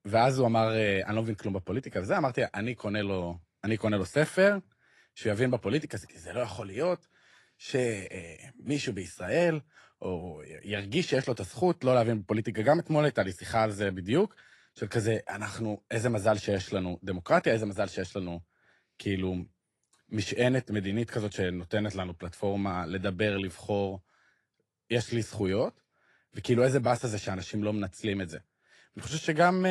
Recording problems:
garbled, watery; slightly; nothing above 11 kHz
abrupt cut into speech; at the end

